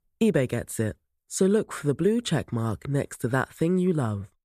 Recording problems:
none

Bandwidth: 14.5 kHz